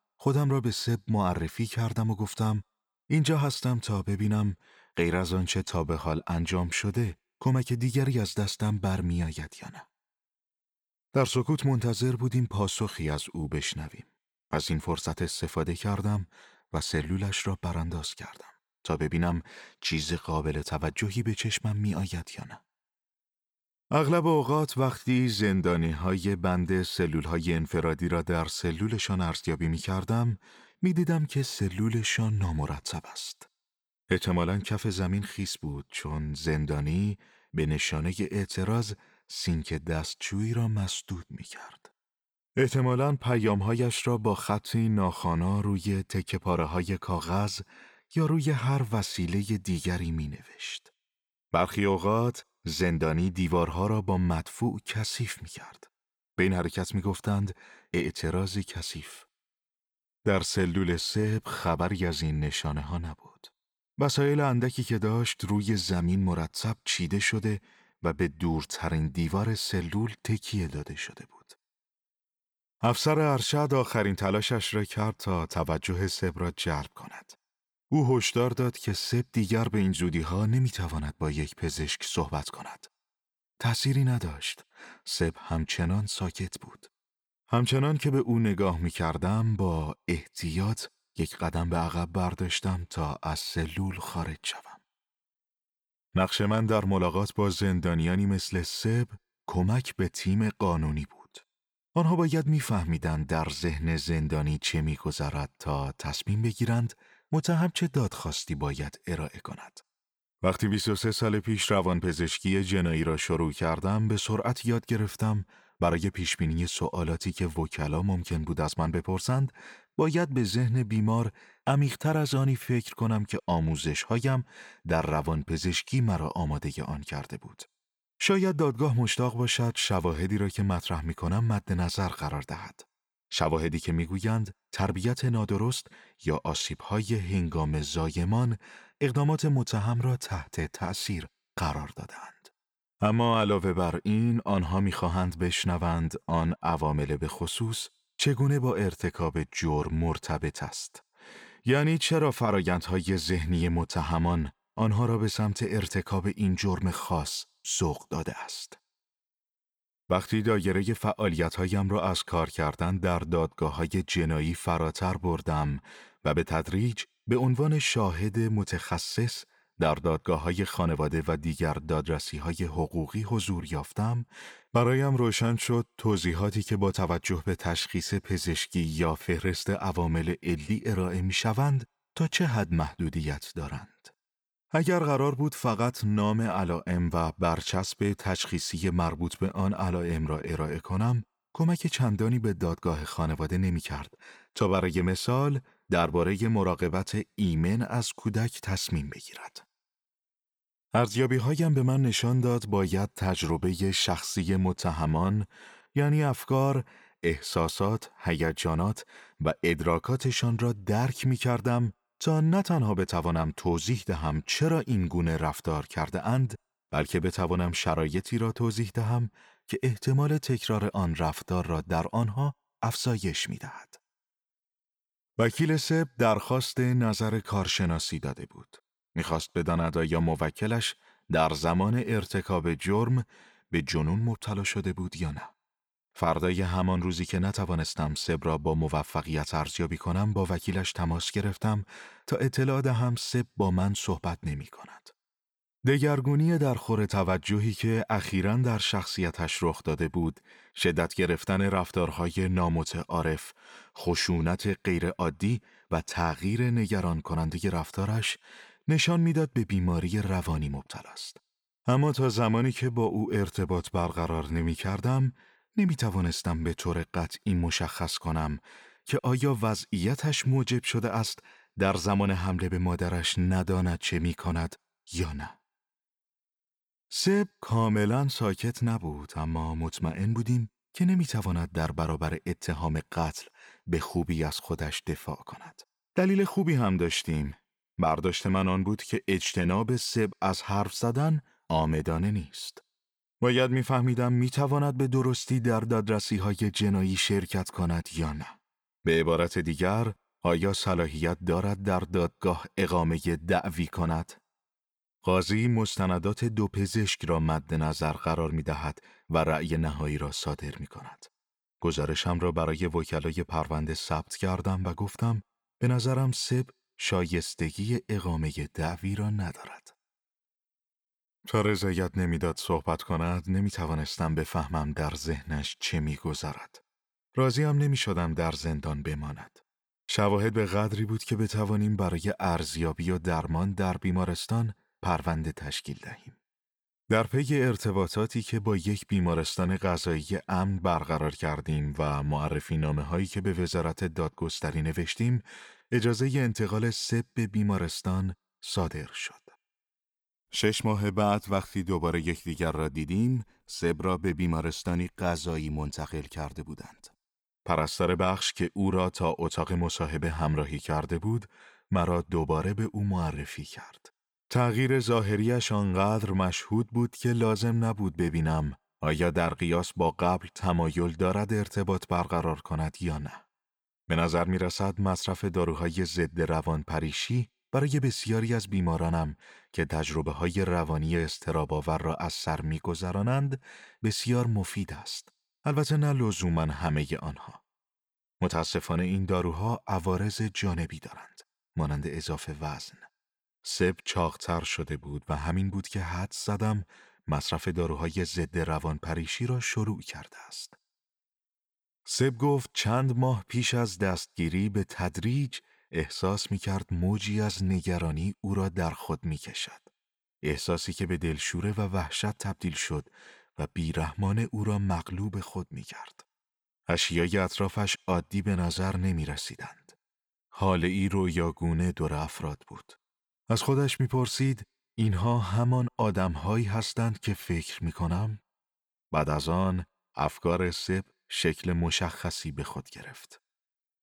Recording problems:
none

